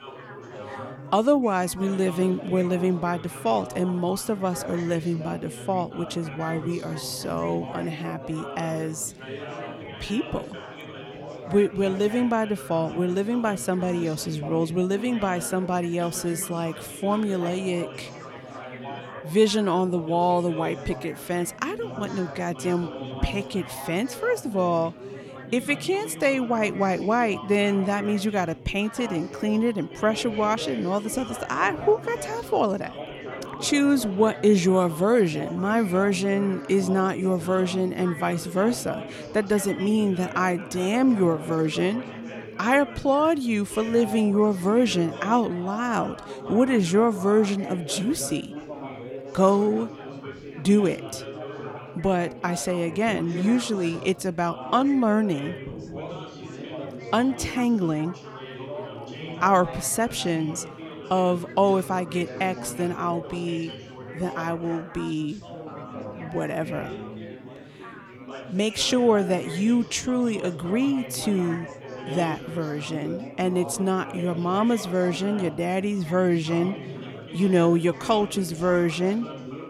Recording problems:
chatter from many people; noticeable; throughout; 10 dB below the speech

